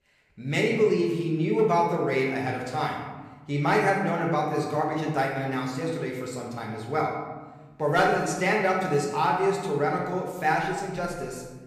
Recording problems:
room echo; noticeable; dies away in 1.2 s
off-mic speech; somewhat distant

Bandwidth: 15 kHz